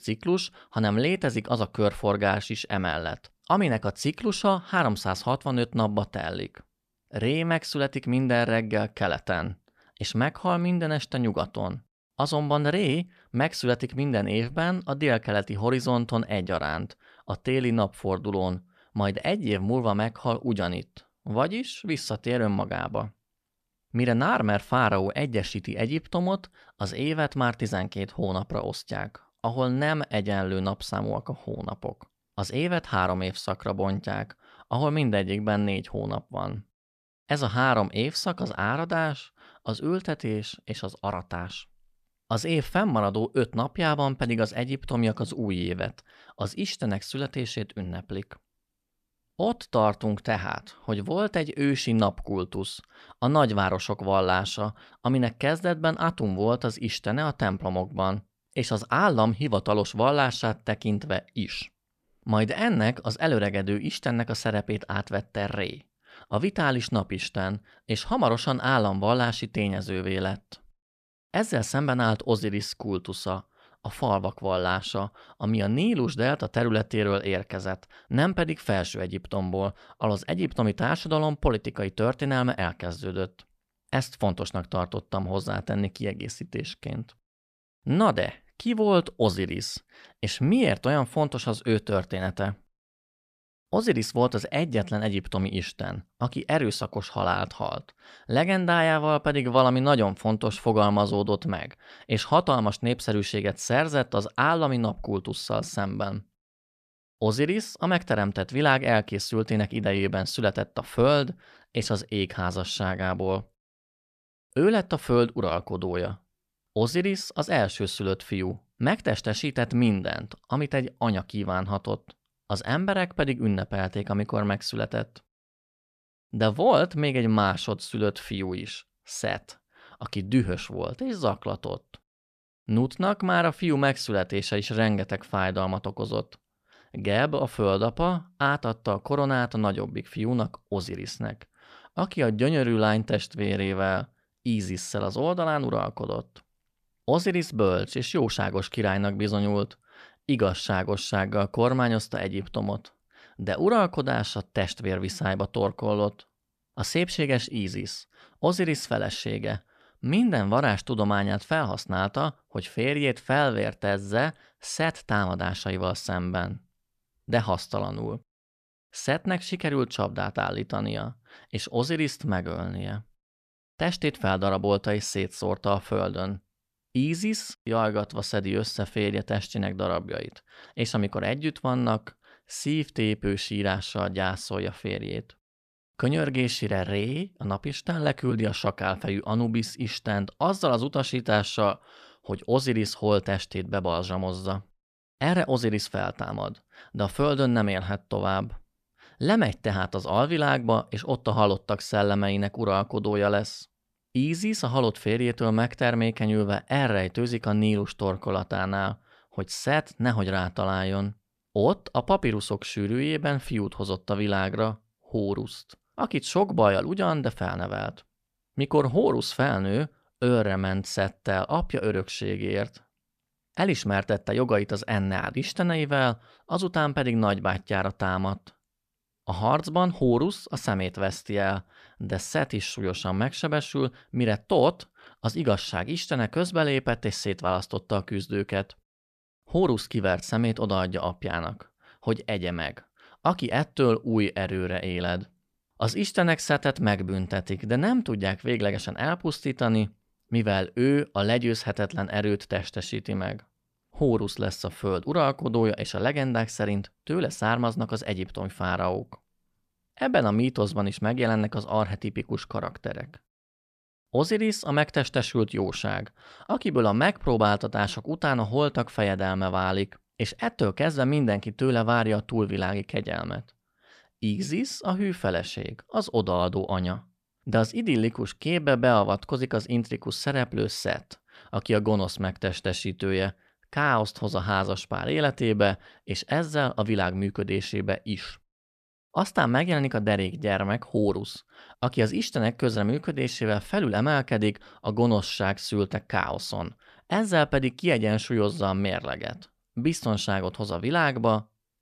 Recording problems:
none

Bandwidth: 14.5 kHz